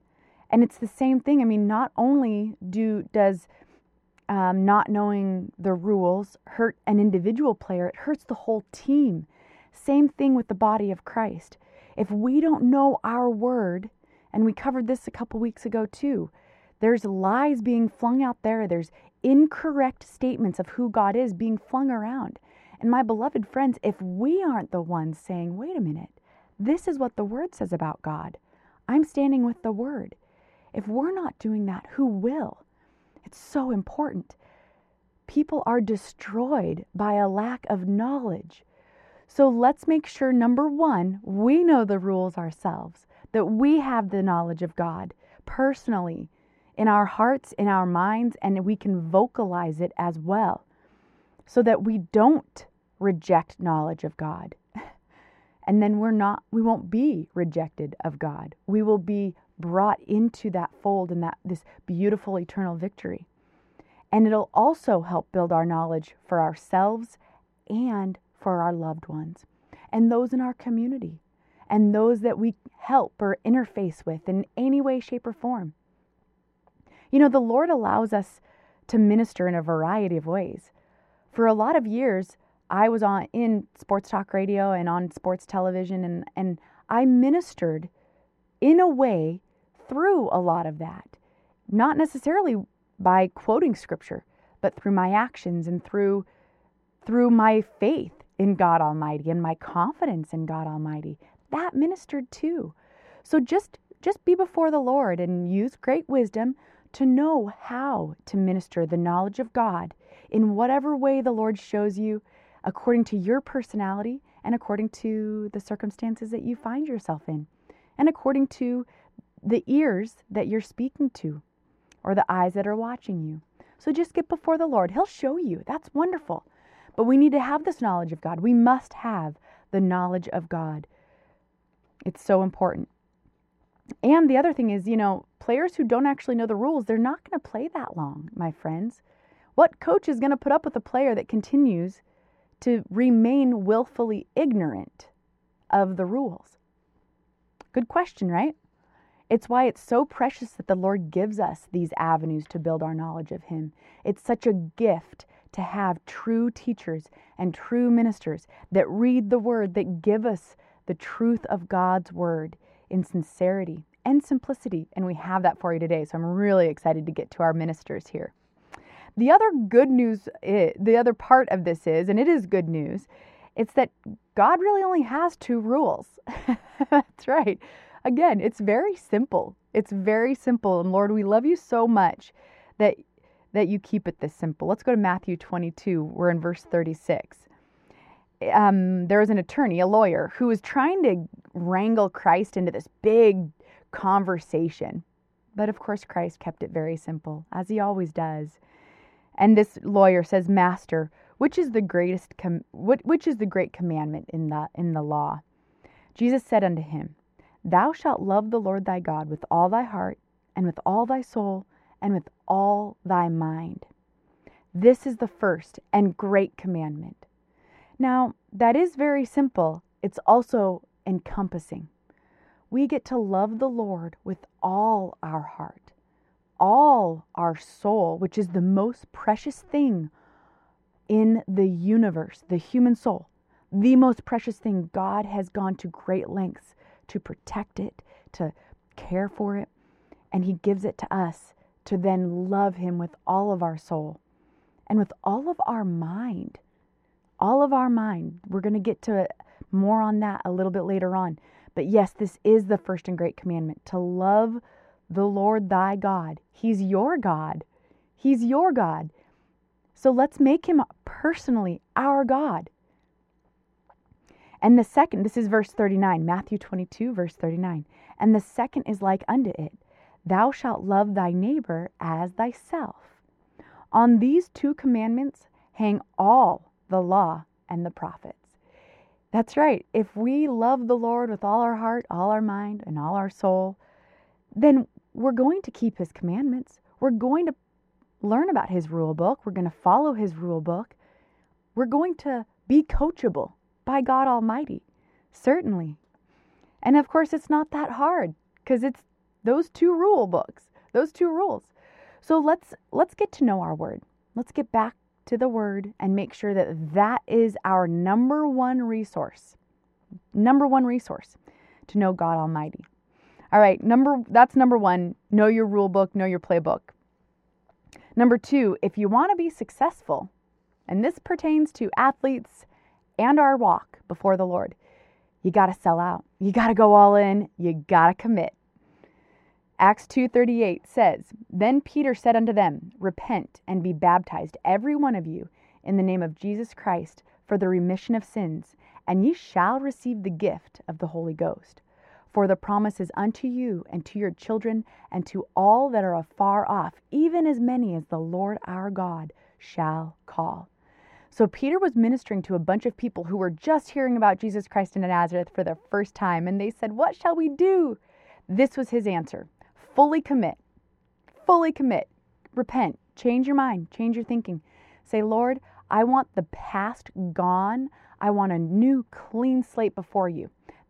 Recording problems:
muffled; very; fading above 3.5 kHz

